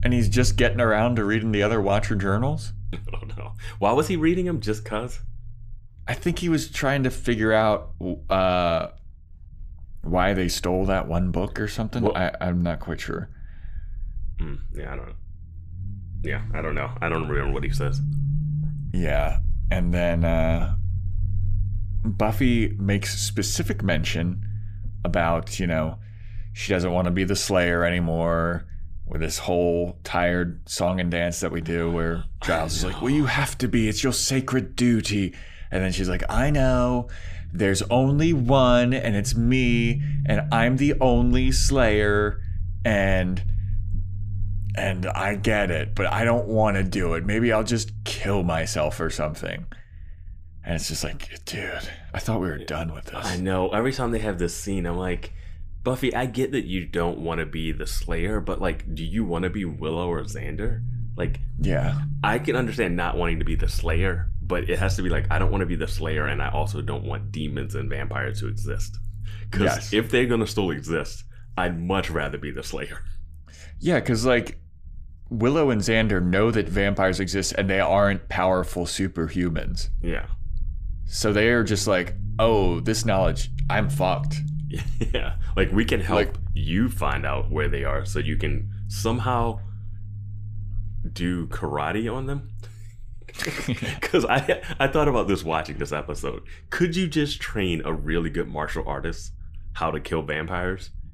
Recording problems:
low rumble; faint; throughout; 20 dB below the speech

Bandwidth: 15 kHz